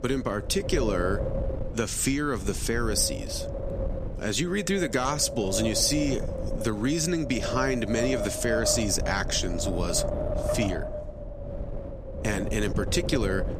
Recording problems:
wind noise on the microphone; heavy; 5 dB below the speech

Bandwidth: 14.5 kHz